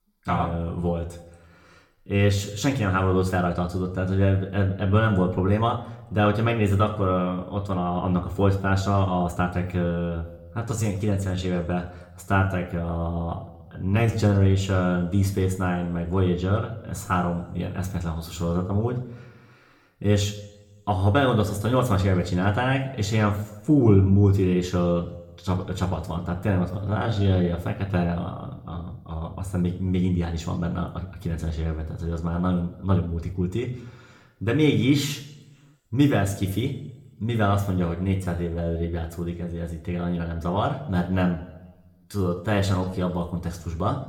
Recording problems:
room echo; slight; dies away in 0.6 s
off-mic speech; somewhat distant
uneven, jittery; strongly; from 2 to 43 s

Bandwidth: 18 kHz